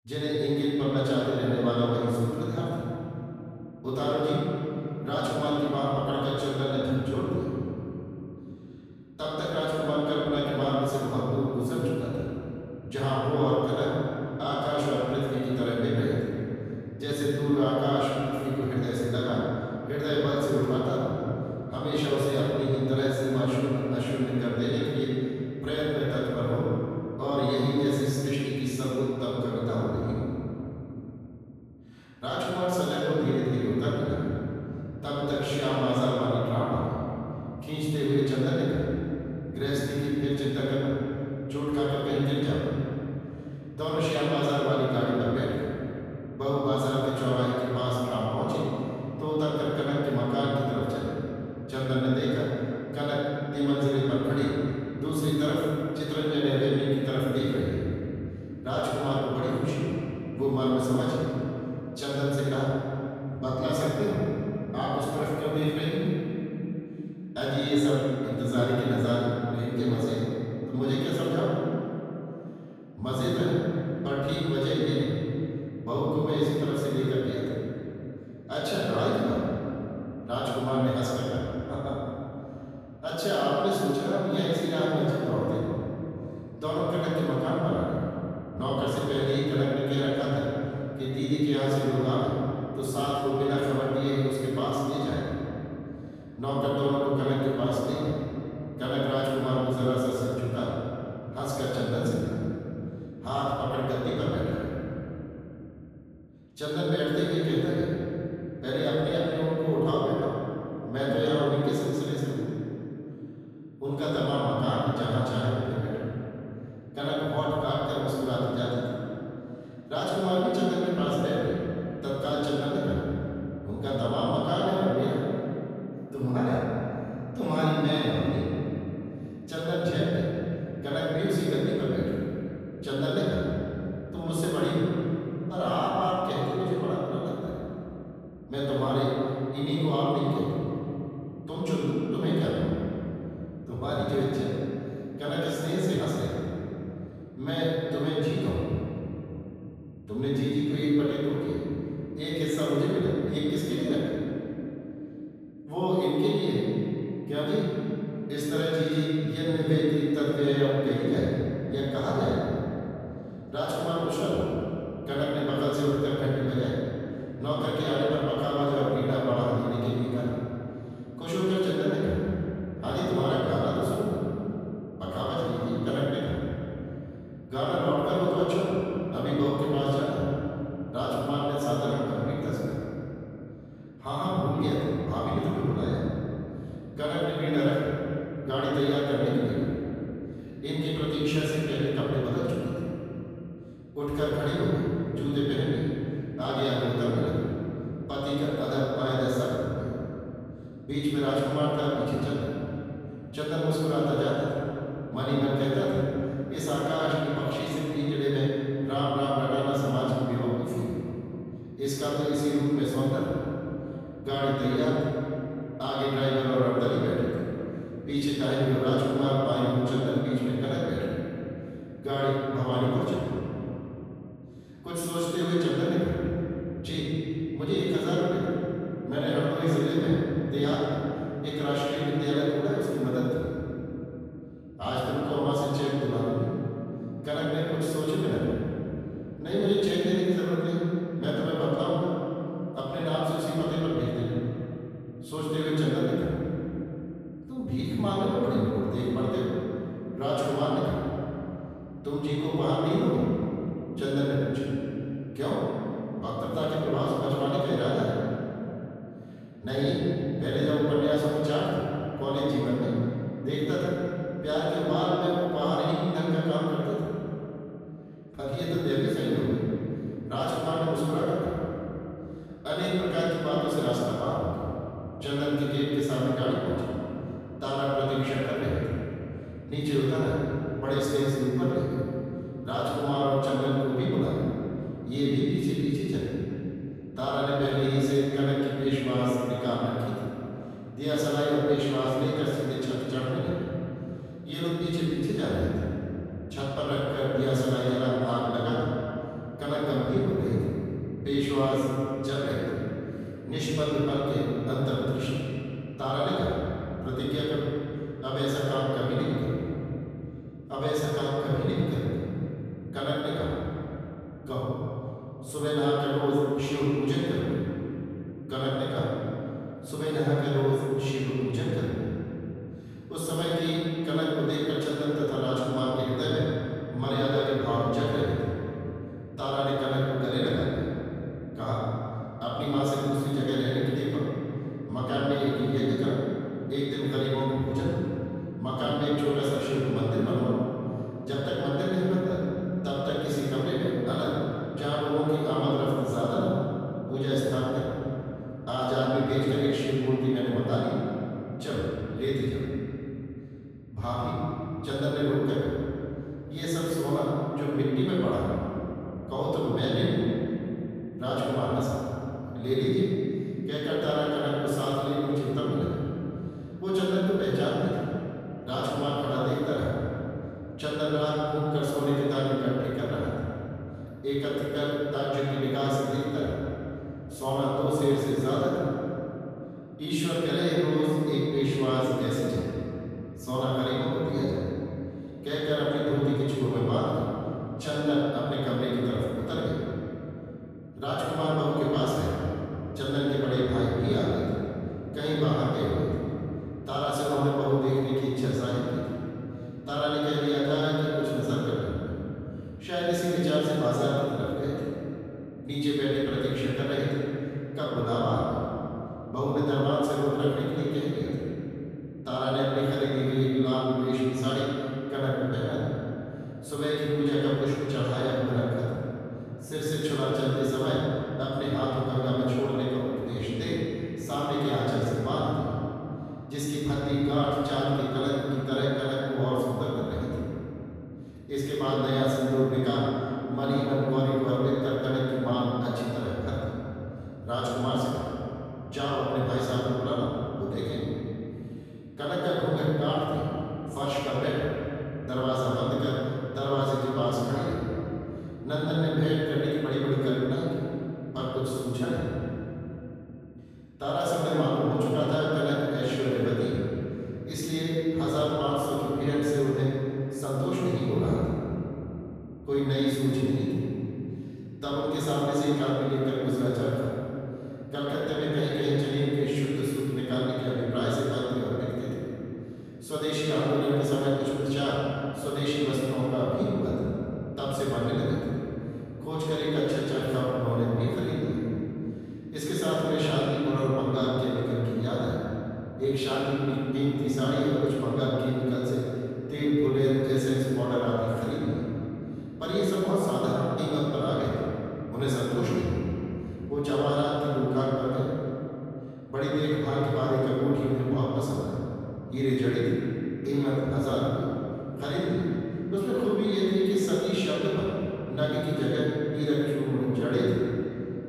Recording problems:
room echo; strong; dies away in 3 s
off-mic speech; far

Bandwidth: 14.5 kHz